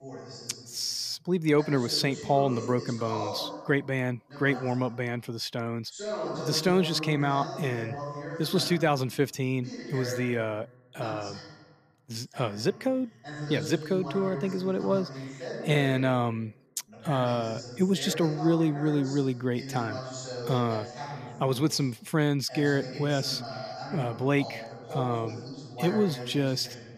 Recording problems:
voice in the background; loud; throughout; 10 dB below the speech

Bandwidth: 14.5 kHz